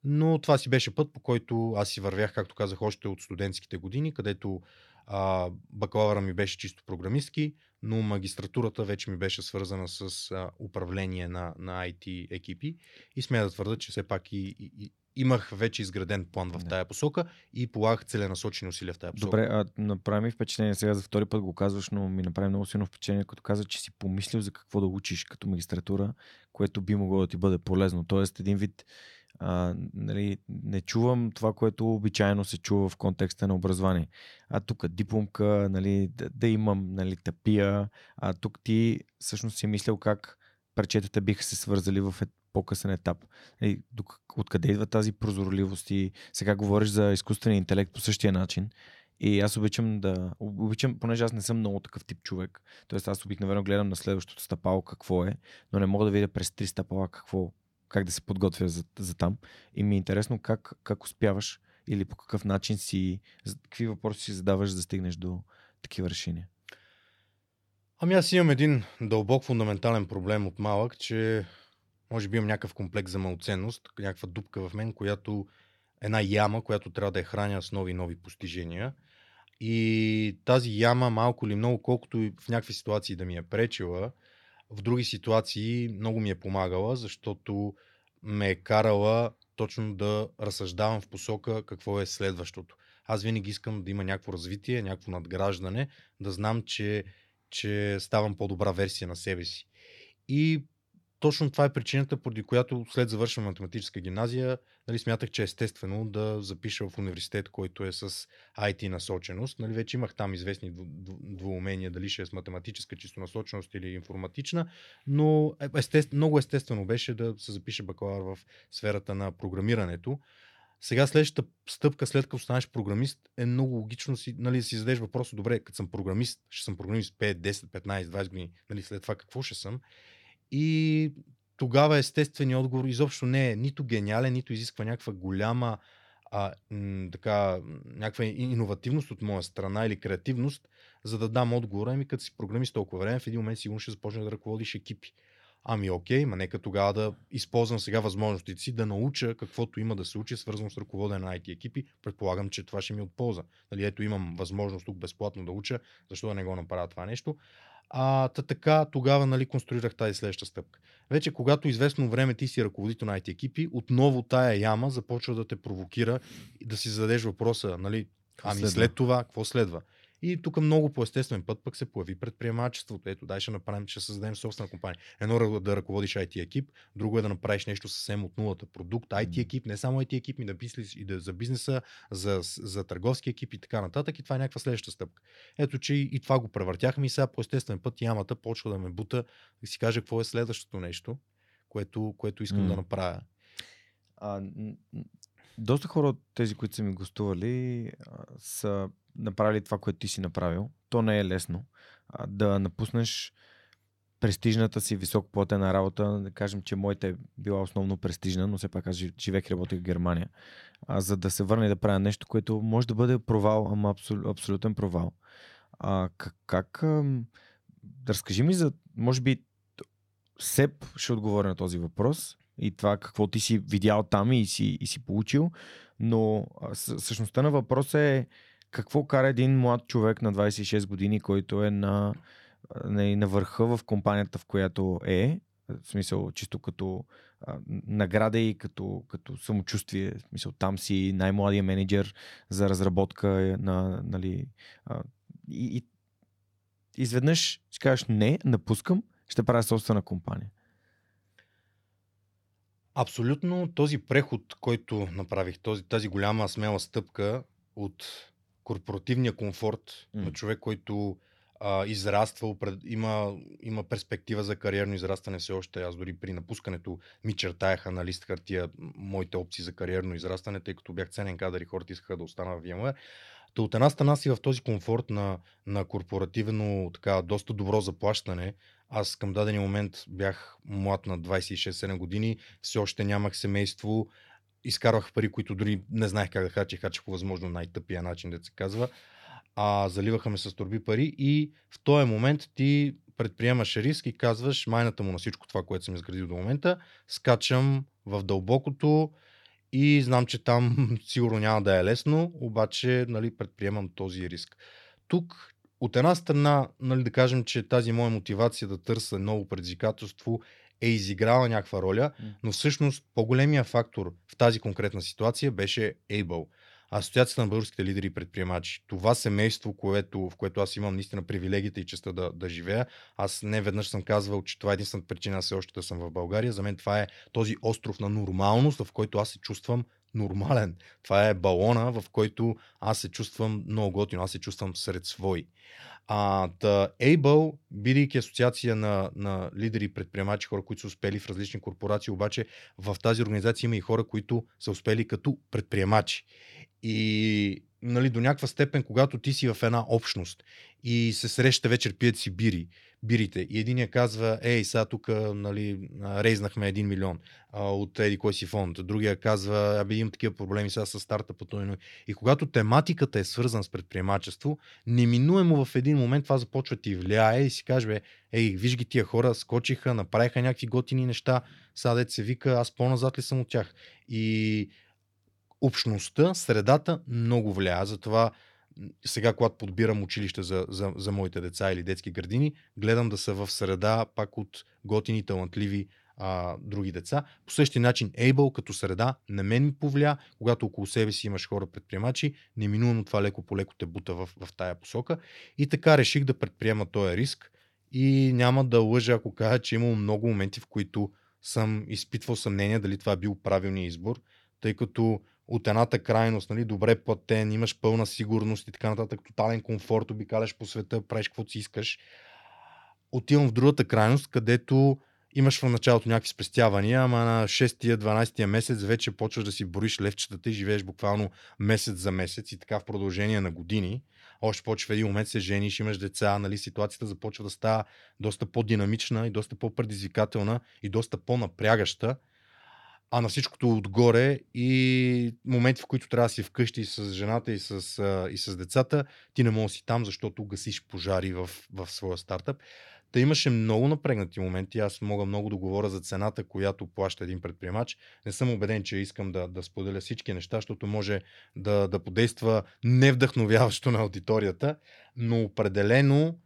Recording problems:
none

